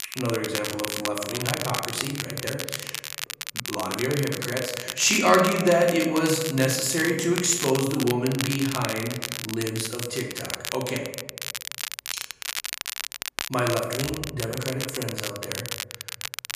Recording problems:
room echo; noticeable; dies away in 0.8 s
off-mic speech; somewhat distant
crackle, like an old record; loud; 6 dB below the speech

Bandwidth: 14.5 kHz